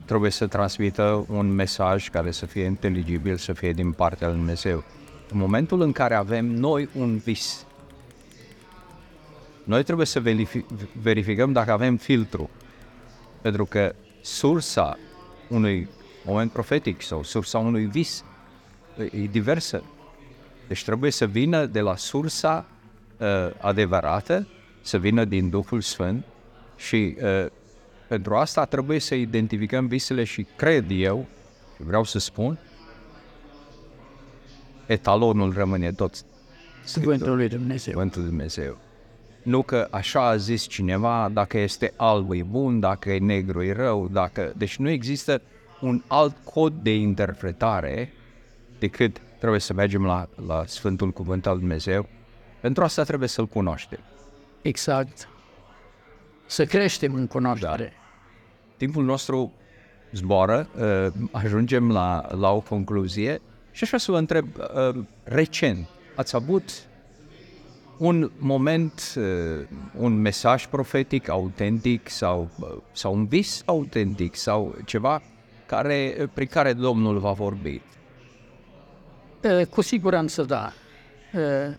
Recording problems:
chatter from many people; faint; throughout; 25 dB below the speech

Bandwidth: 18 kHz